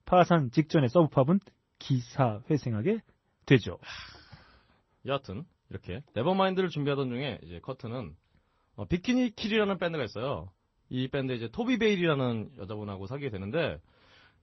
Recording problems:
garbled, watery; slightly; nothing above 6 kHz

